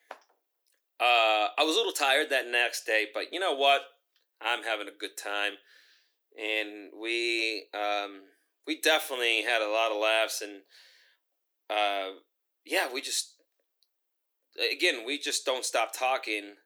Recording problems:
thin; somewhat; fading below 300 Hz

